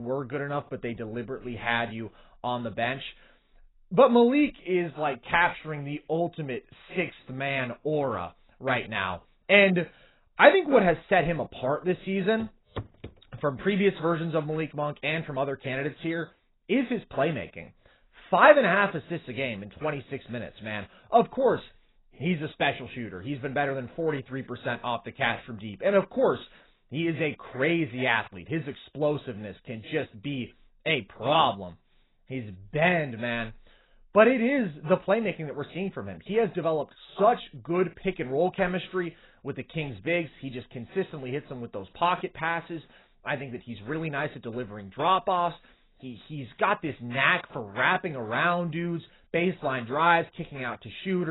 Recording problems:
garbled, watery; badly; nothing above 4 kHz
abrupt cut into speech; at the start and the end
footsteps; faint; at 12 s; peak 15 dB below the speech

